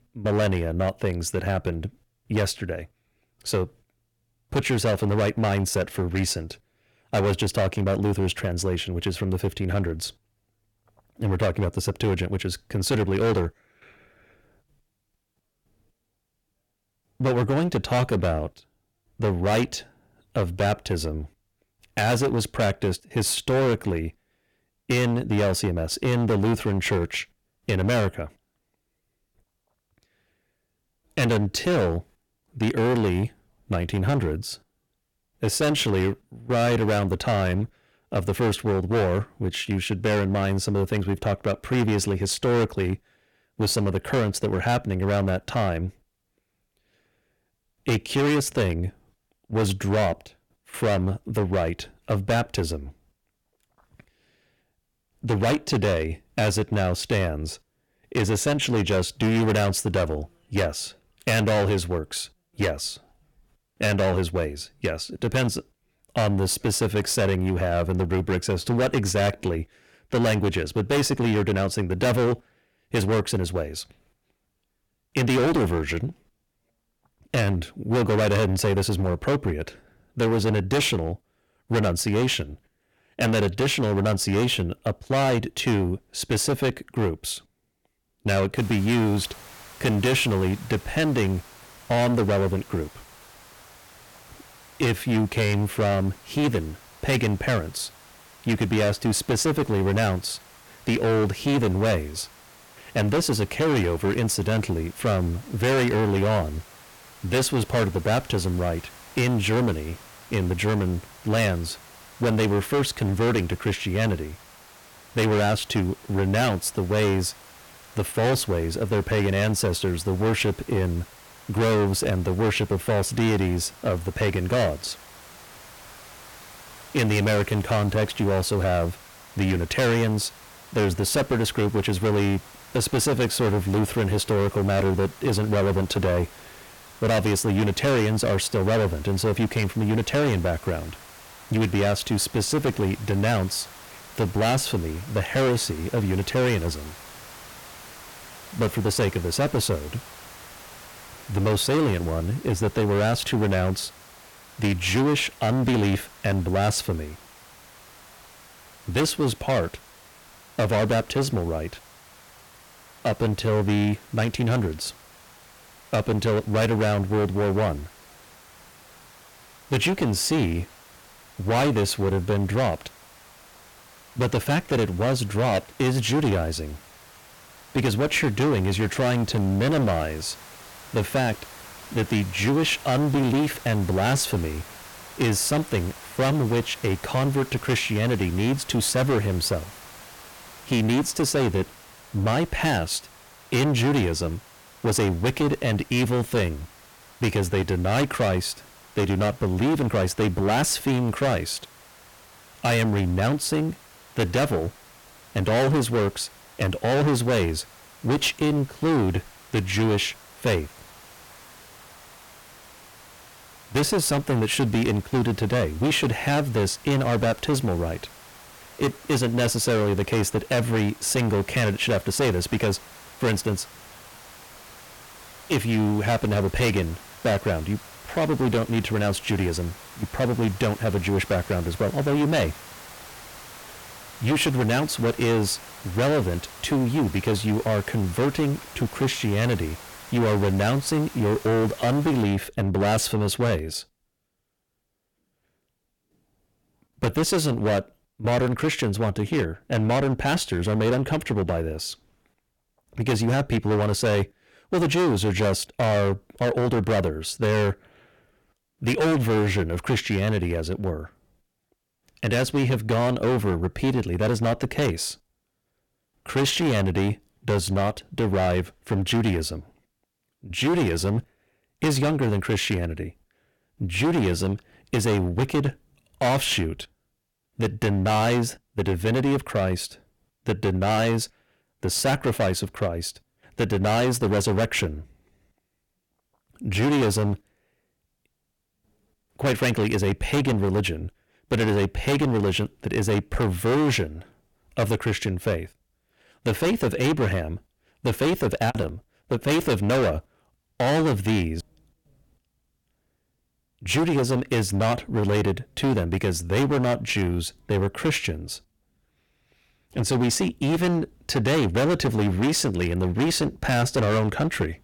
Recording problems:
distortion; heavy; 17% of the sound clipped
hiss; faint; from 1:29 to 4:02; 20 dB below the speech

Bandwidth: 17.5 kHz